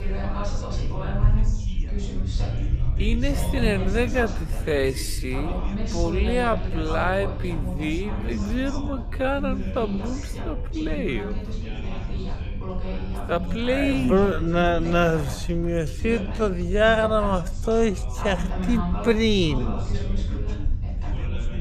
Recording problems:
wrong speed, natural pitch; too slow; 0.5 times normal speed
background chatter; loud; throughout; 3 voices, 10 dB below the speech
low rumble; faint; throughout; 25 dB below the speech

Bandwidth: 14.5 kHz